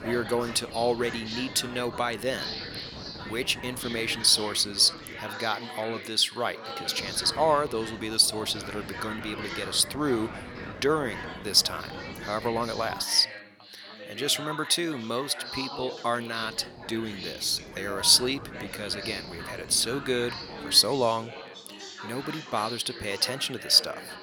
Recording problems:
thin; somewhat; fading below 750 Hz
background chatter; noticeable; throughout; 4 voices, 15 dB below the speech
wind noise on the microphone; occasional gusts; until 5.5 s, from 7 to 13 s and from 16 to 21 s; 20 dB below the speech

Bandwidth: 18.5 kHz